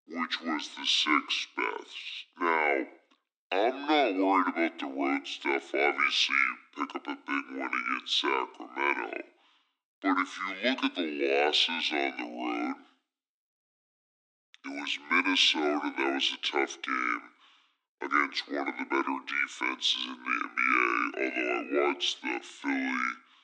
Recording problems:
wrong speed and pitch; too slow and too low; 0.6 times normal speed
thin; very slightly; fading below 250 Hz

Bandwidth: 9 kHz